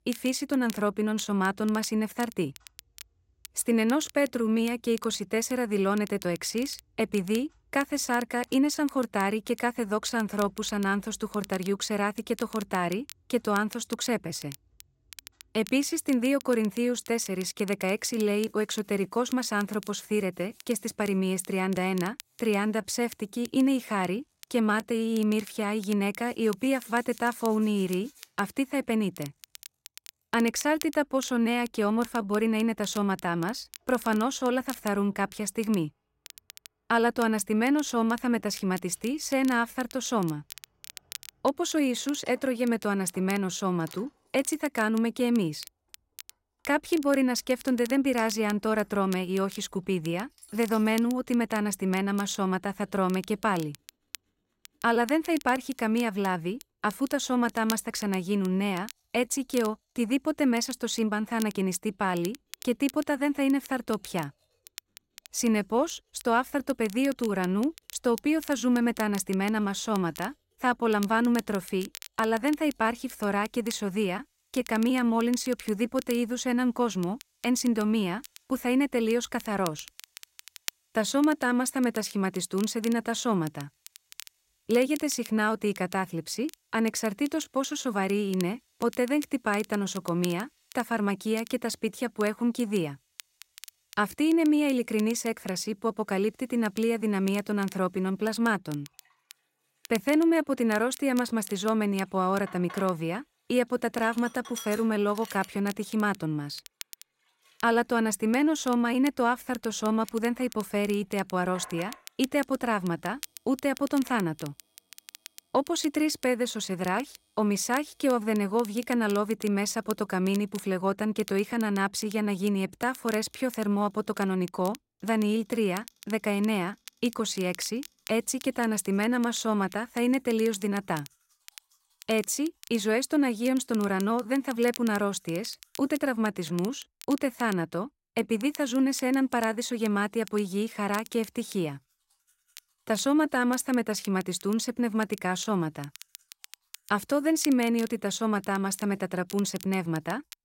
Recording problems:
crackle, like an old record; noticeable; 20 dB below the speech
household noises; faint; throughout; 30 dB below the speech

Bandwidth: 16 kHz